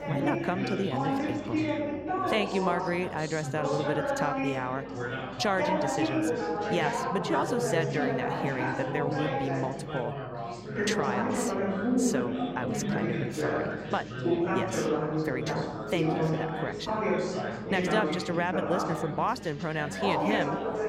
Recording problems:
chatter from many people; very loud; throughout; 2 dB above the speech
electrical hum; faint; throughout; 50 Hz, 25 dB below the speech

